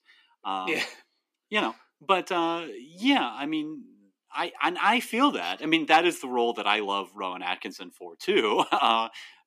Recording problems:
thin; very slightly; fading below 250 Hz

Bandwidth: 14.5 kHz